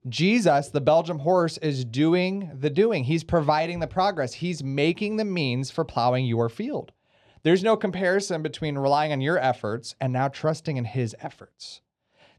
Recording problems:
muffled; very slightly; fading above 3.5 kHz

